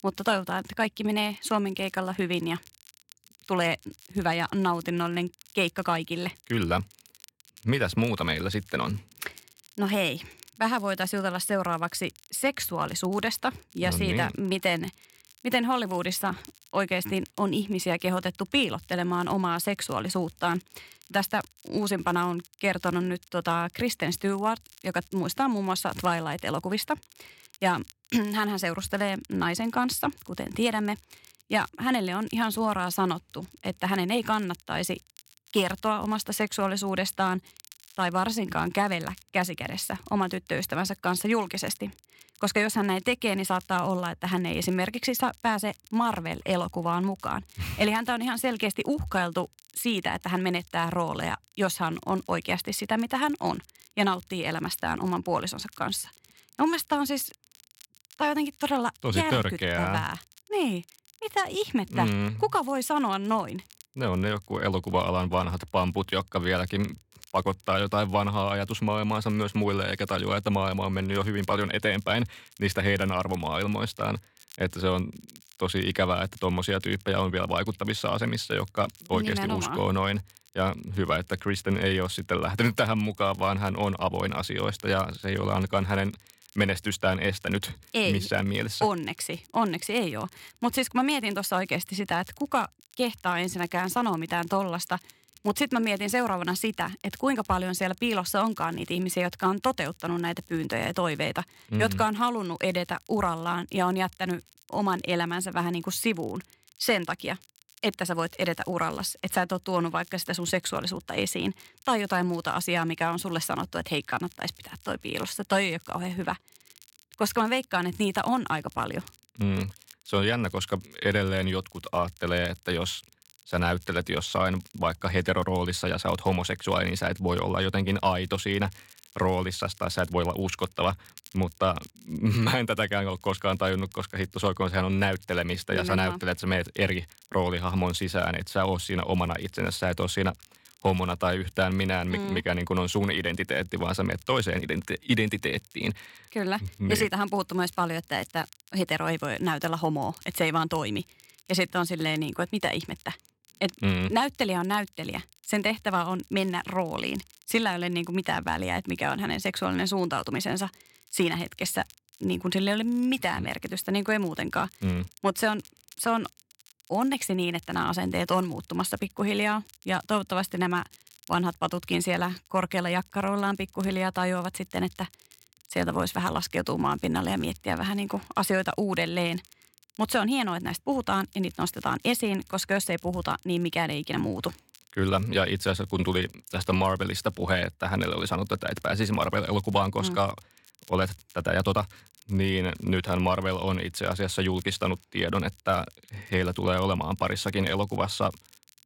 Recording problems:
crackle, like an old record; faint; 25 dB below the speech

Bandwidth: 16.5 kHz